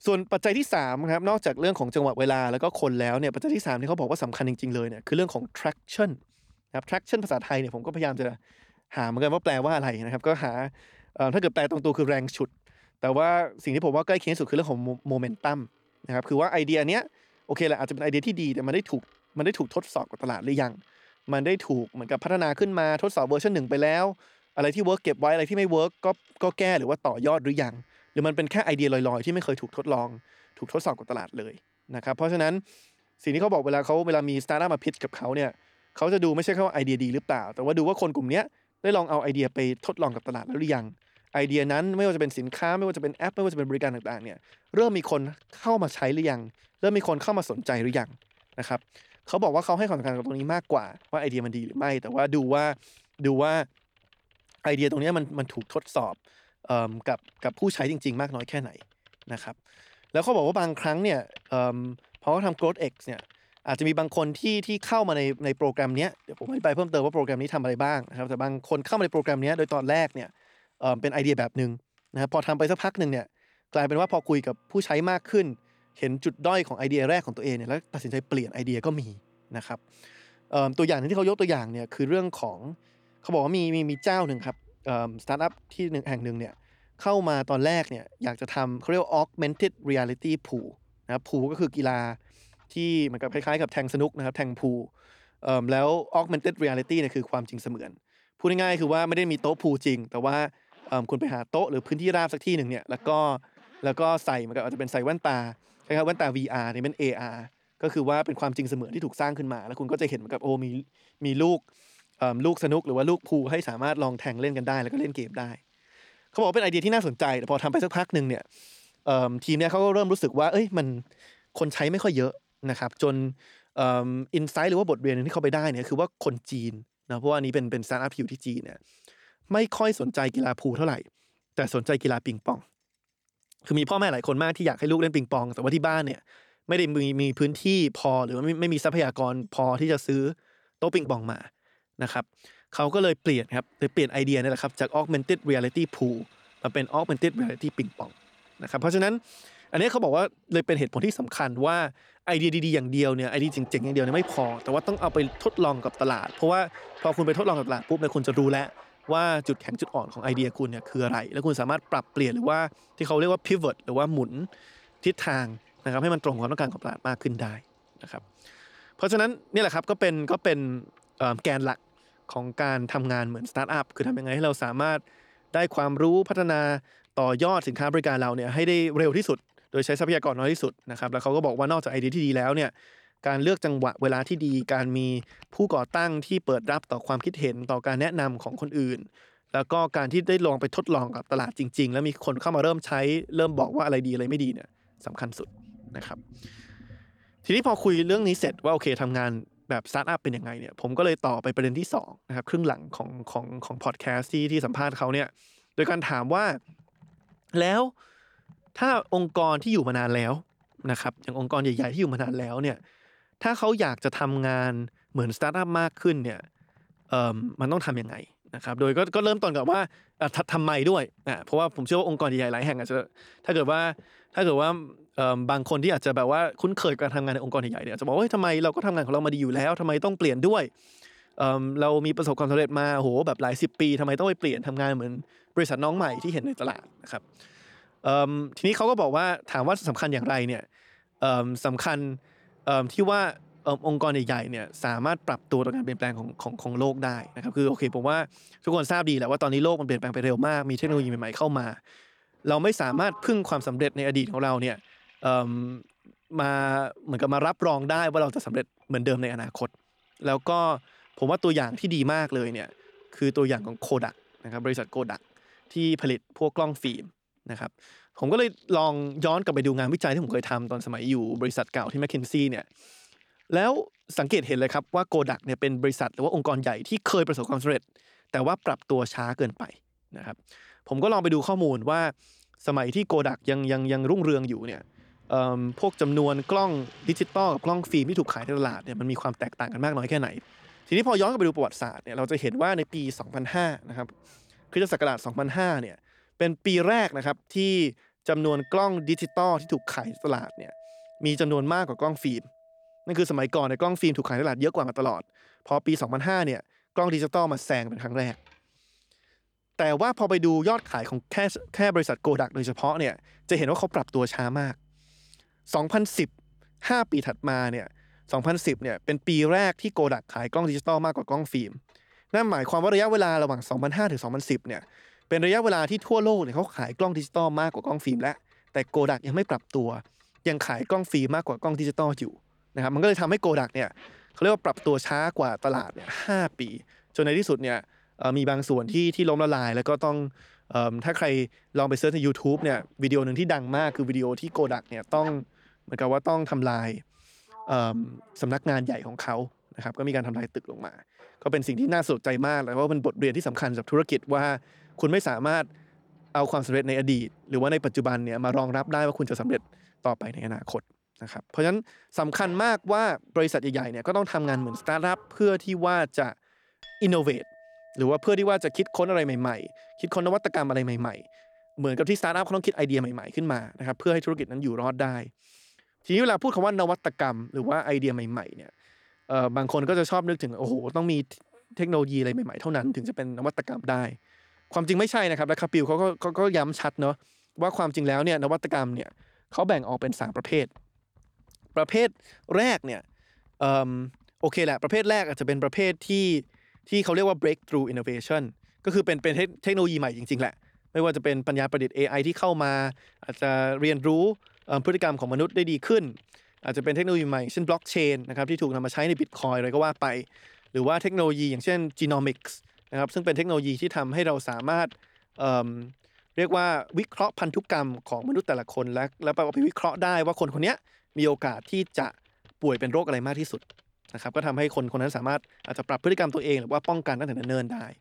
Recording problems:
household noises; faint; throughout; 30 dB below the speech

